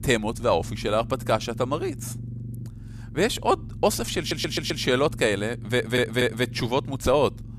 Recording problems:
low rumble; faint; throughout; 25 dB below the speech
audio stuttering; at 4 s and at 5.5 s

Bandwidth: 14.5 kHz